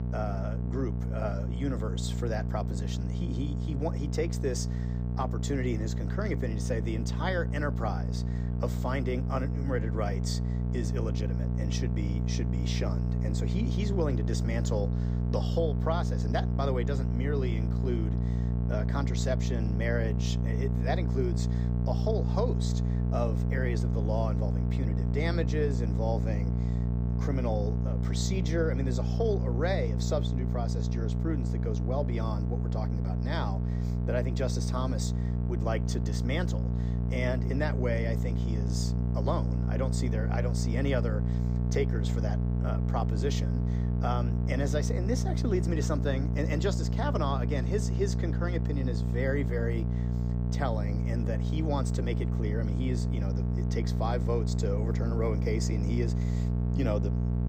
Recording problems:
electrical hum; loud; throughout; 60 Hz, 5 dB below the speech

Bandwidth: 15.5 kHz